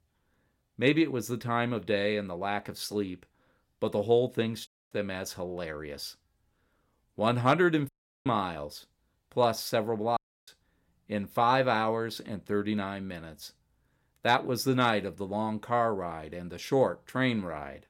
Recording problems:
audio cutting out; at 4.5 s, at 8 s and at 10 s

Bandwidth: 16.5 kHz